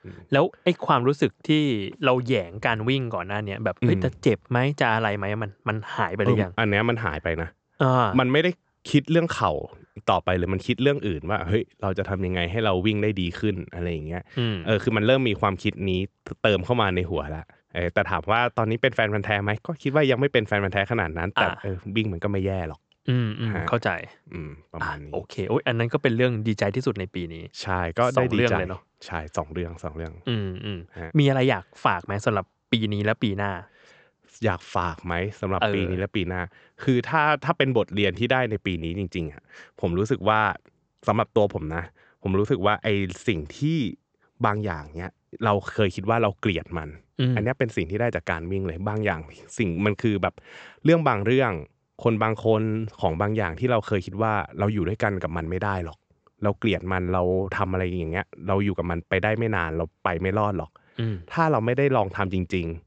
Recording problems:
high frequencies cut off; noticeable; nothing above 8 kHz

